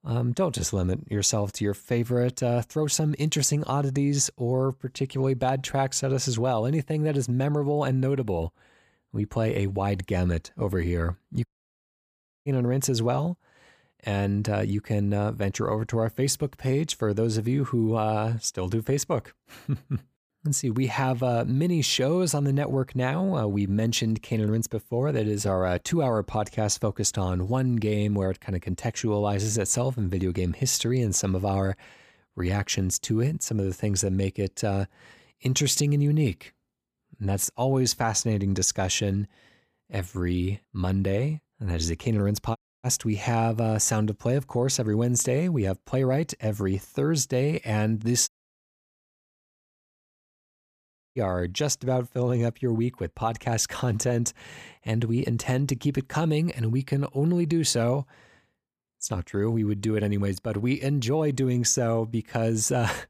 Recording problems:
audio cutting out; at 11 s for 1 s, at 43 s and at 48 s for 3 s

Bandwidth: 15 kHz